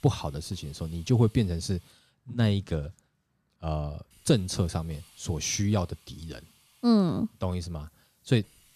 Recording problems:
hiss; faint; until 2 s and from 4 s on; 30 dB below the speech

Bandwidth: 14 kHz